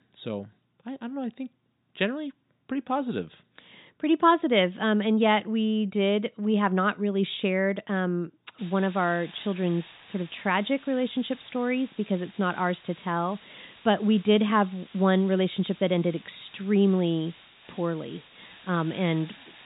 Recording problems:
high frequencies cut off; severe; nothing above 4 kHz
hiss; faint; from 8.5 s on; 25 dB below the speech

